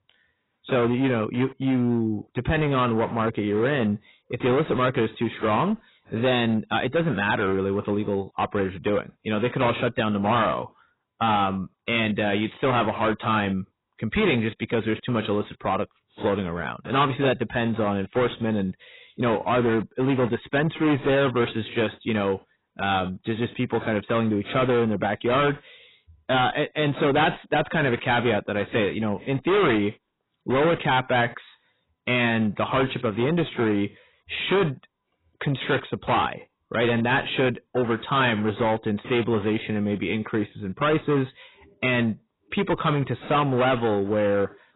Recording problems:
distortion; heavy; 13% of the sound clipped
garbled, watery; badly; nothing above 4 kHz

